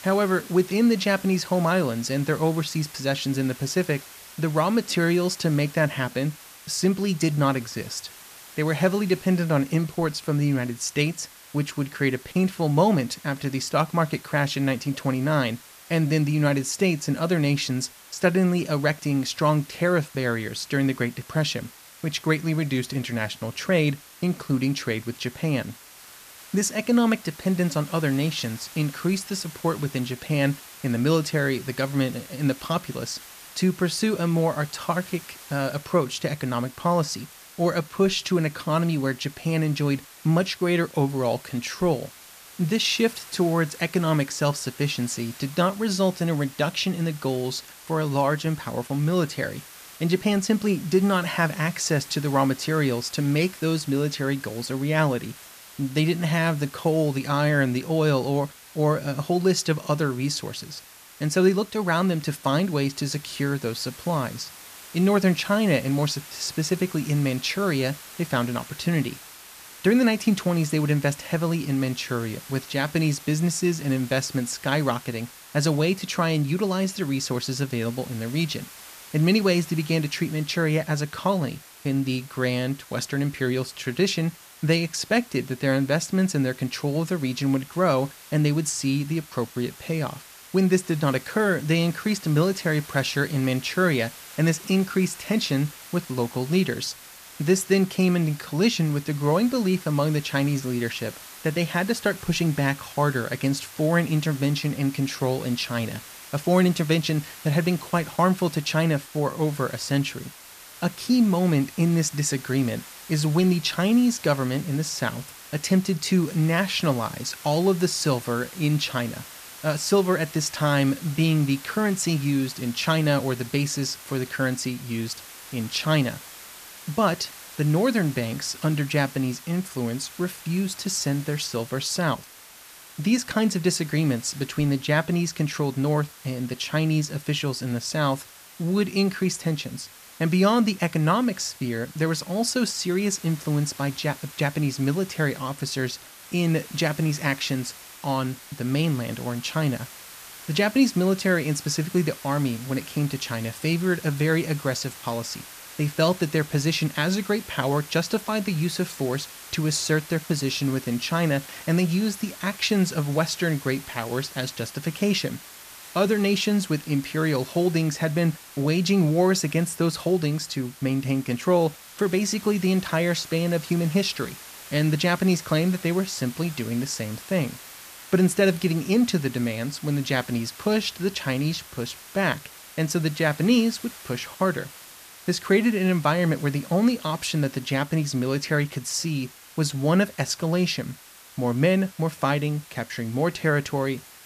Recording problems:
hiss; noticeable; throughout; 15 dB below the speech

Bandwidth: 14.5 kHz